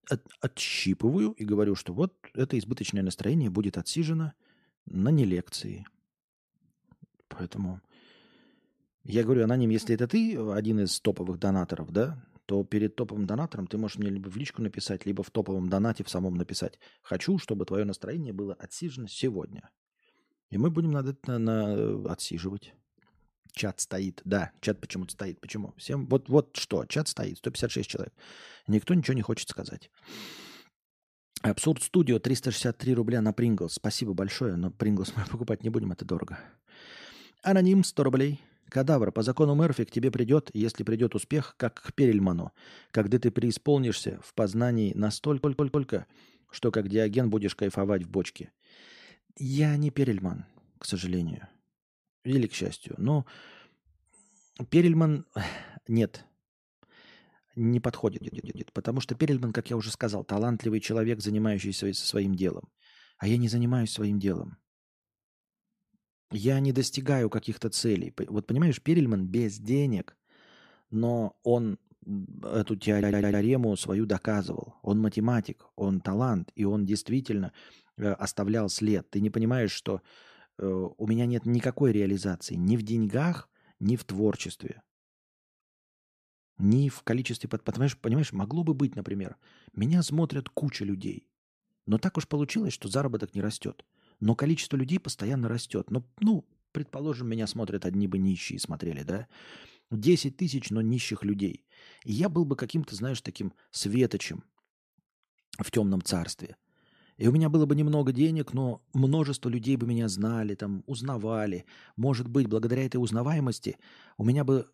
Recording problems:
audio stuttering; at 45 s, at 58 s and at 1:13

